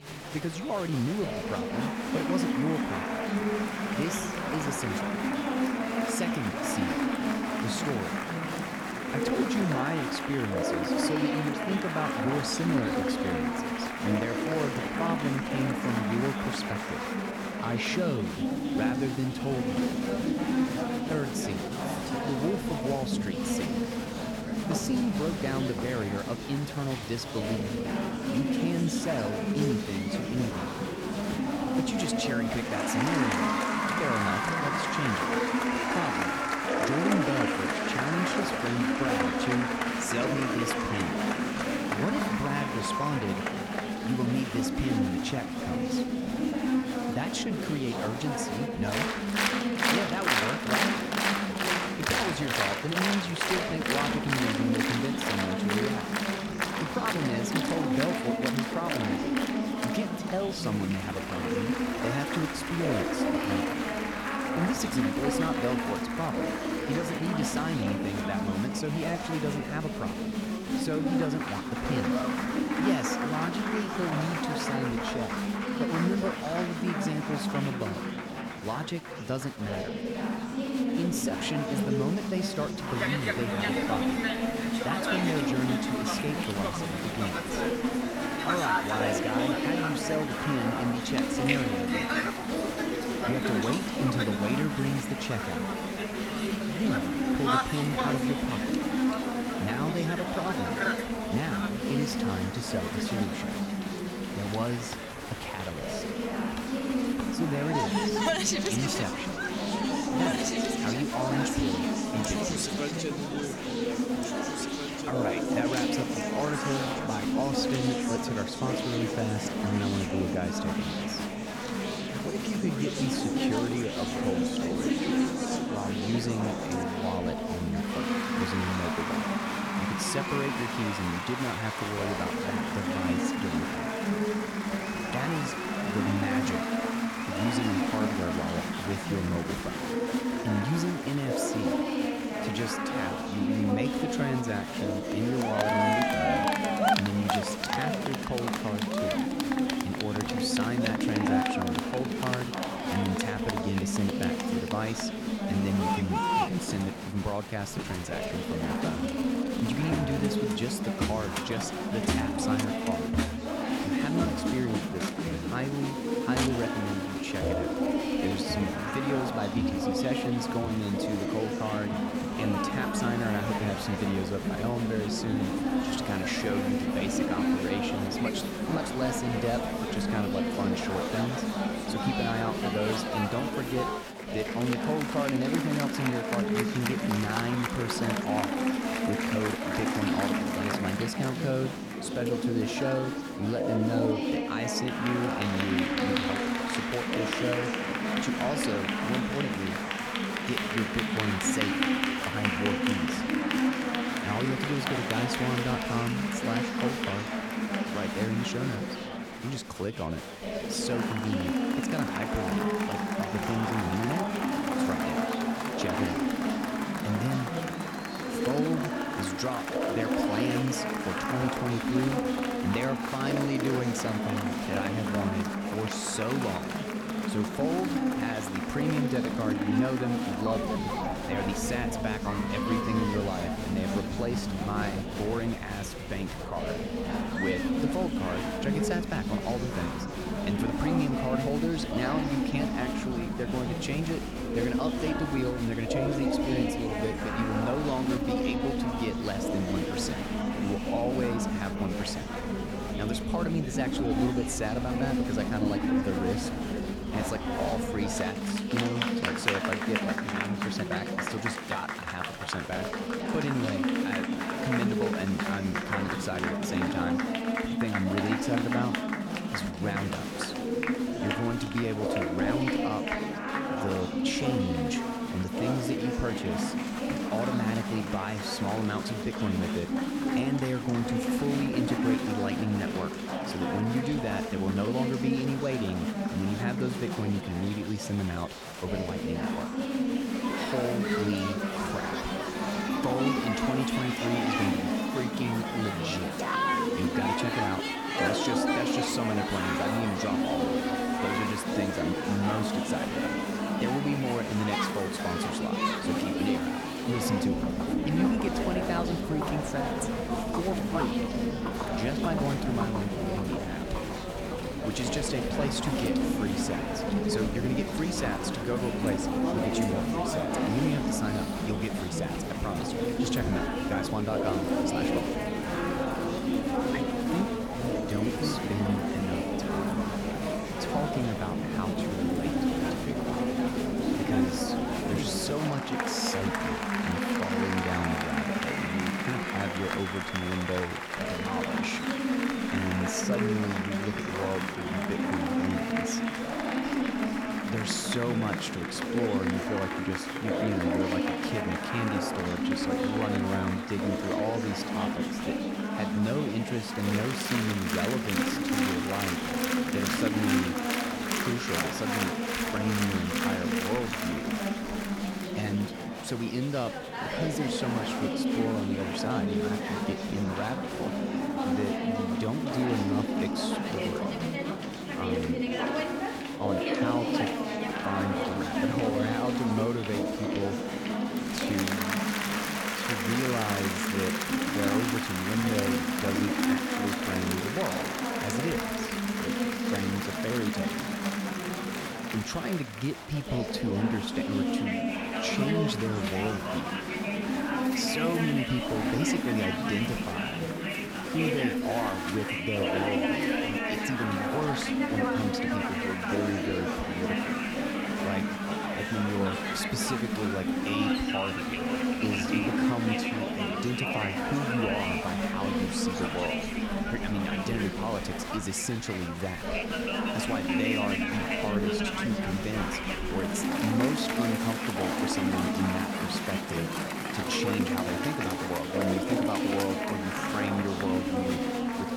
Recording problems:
chatter from many people; very loud; throughout; 3 dB above the speech

